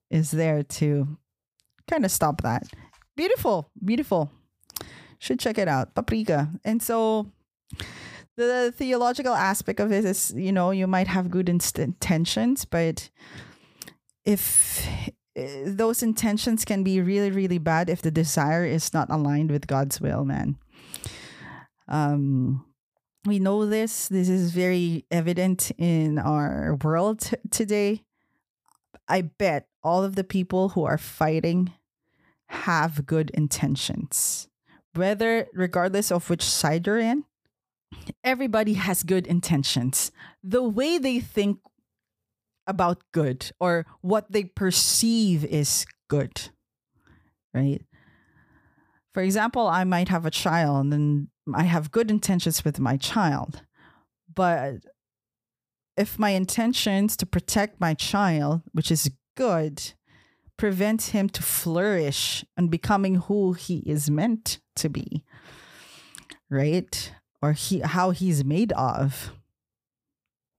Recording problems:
none

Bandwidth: 15 kHz